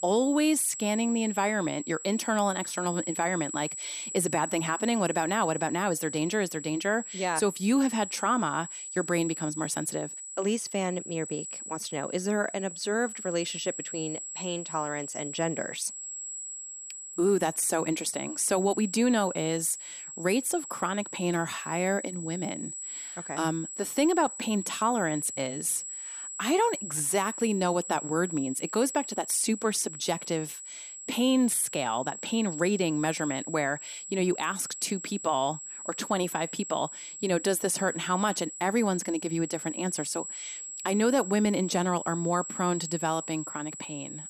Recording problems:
high-pitched whine; loud; throughout; 7.5 kHz, 8 dB below the speech

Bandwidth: 14.5 kHz